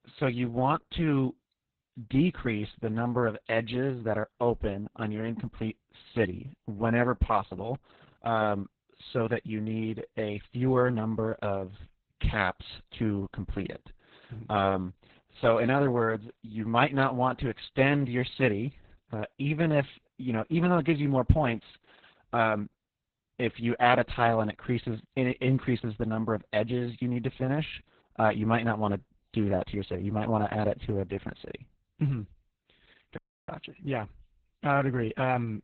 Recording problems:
garbled, watery; badly; nothing above 4 kHz
audio cutting out; at 33 s

